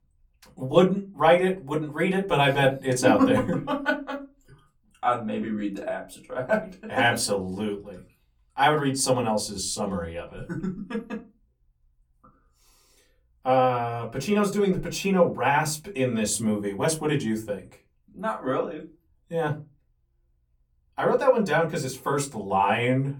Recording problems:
off-mic speech; far
room echo; very slight; dies away in 0.2 s

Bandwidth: 18 kHz